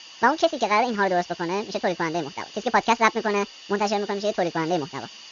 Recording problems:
wrong speed and pitch; too fast and too high; 1.6 times normal speed
high frequencies cut off; noticeable; nothing above 7 kHz
hiss; noticeable; throughout; 15 dB below the speech

